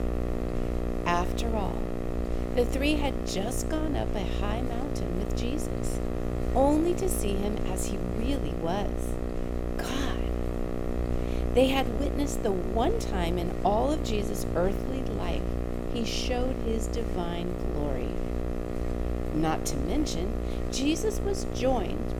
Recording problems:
electrical hum; loud; throughout; 60 Hz, 5 dB below the speech

